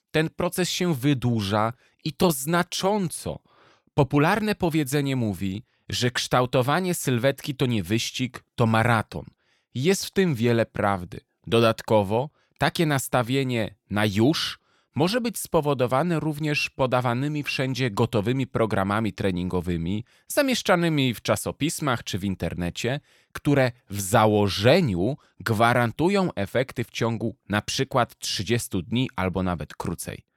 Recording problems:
none

